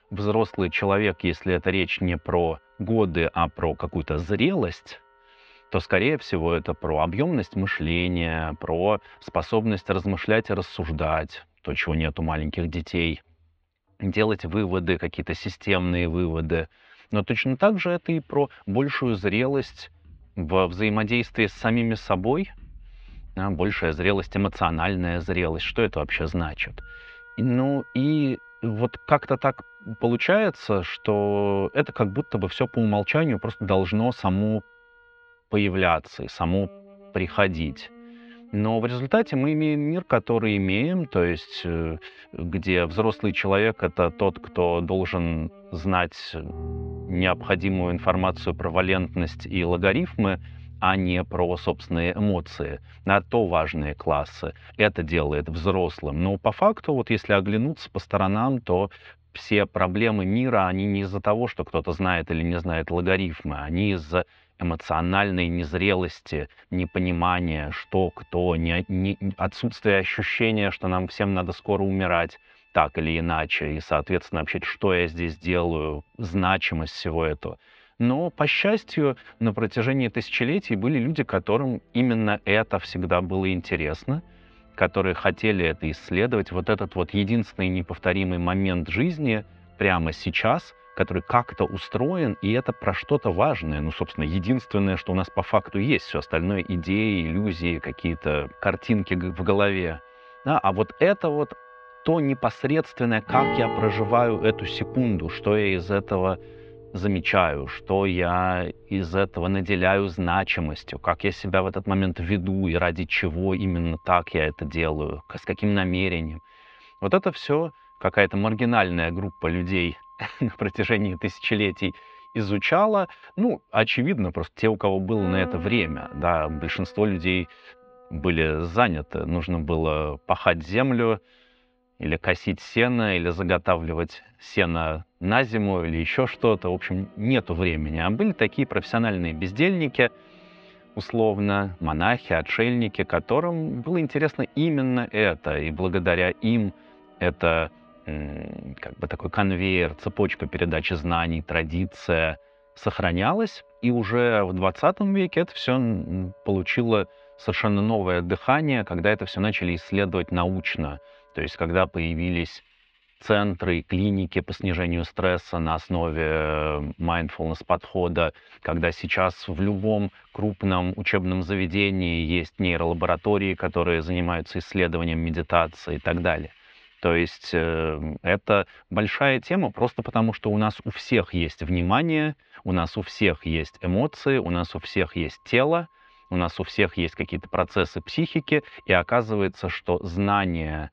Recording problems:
muffled; very; fading above 3 kHz
background music; noticeable; throughout; 20 dB below the speech

